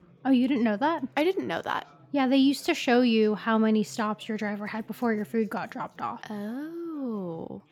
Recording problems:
chatter from many people; faint; throughout; 30 dB below the speech

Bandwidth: 17.5 kHz